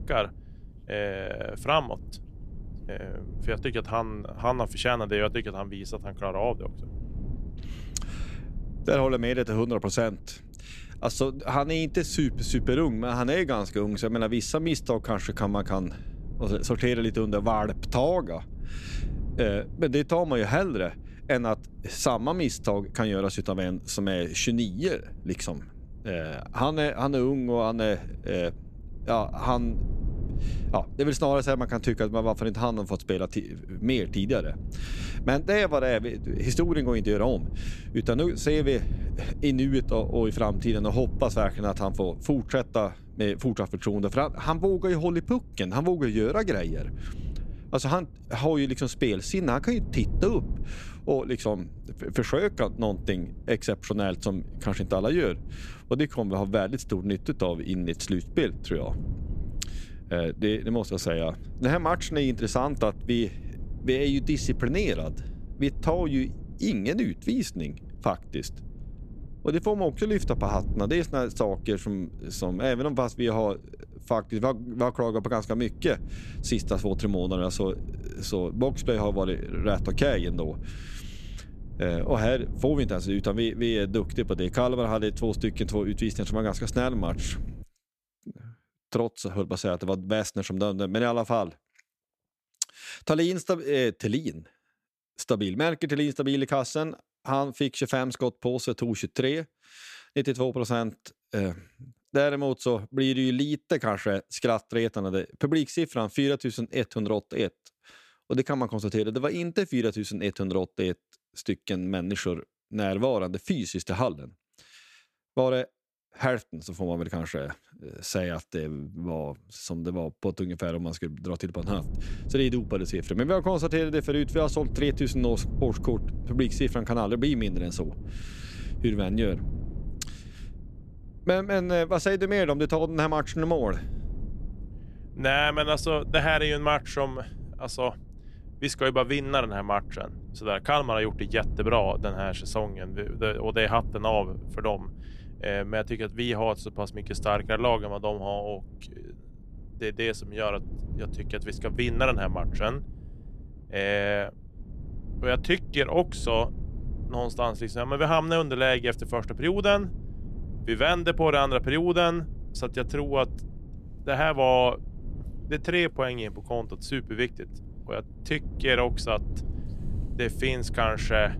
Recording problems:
low rumble; faint; until 1:28 and from 2:02 on; 25 dB below the speech

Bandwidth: 14.5 kHz